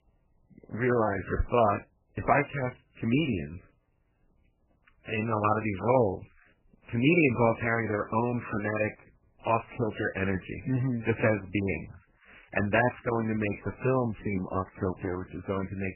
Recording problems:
garbled, watery; badly; nothing above 3 kHz
high-pitched whine; very faint; throughout; 3 kHz, 60 dB below the speech

